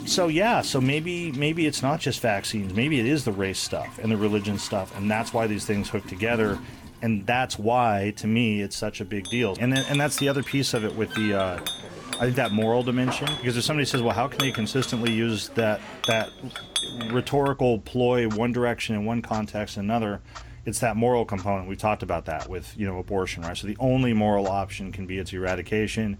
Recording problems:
household noises; noticeable; throughout; 10 dB below the speech

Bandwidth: 18.5 kHz